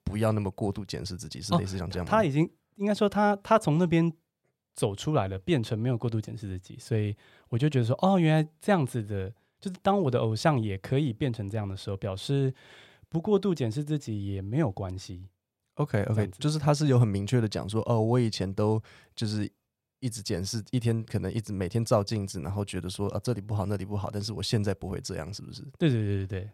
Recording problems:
none

